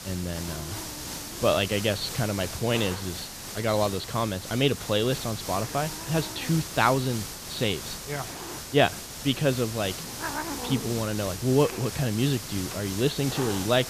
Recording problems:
high frequencies cut off; severe; nothing above 4.5 kHz
hiss; loud; throughout; 7 dB below the speech

